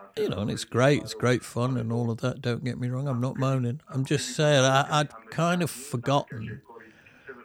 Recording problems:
voice in the background; noticeable; throughout; 20 dB below the speech

